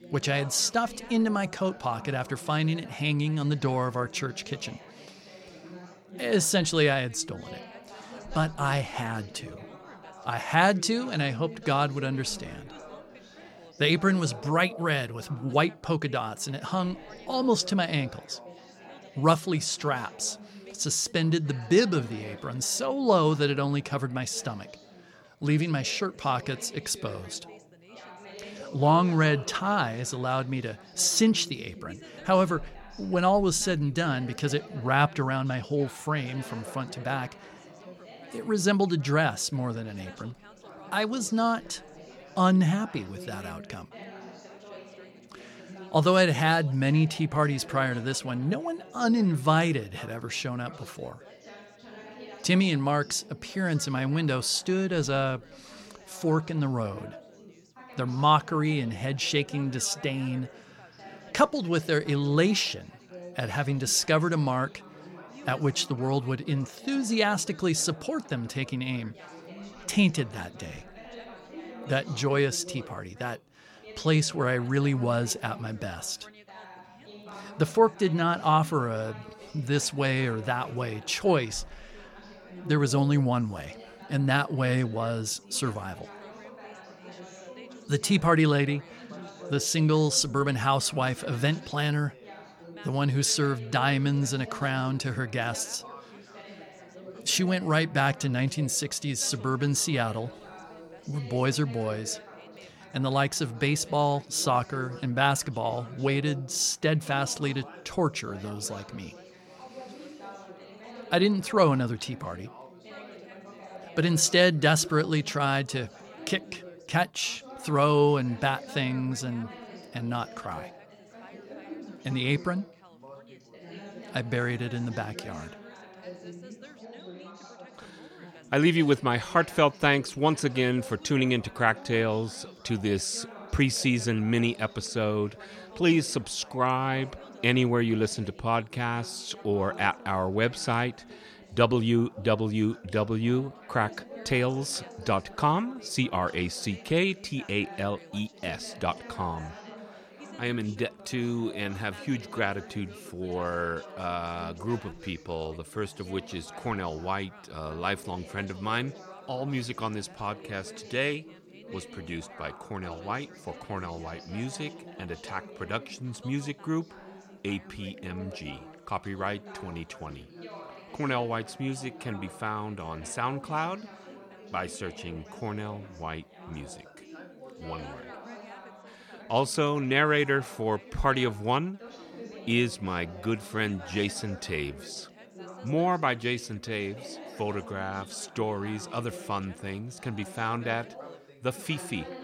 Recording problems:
background chatter; noticeable; throughout; 4 voices, 20 dB below the speech

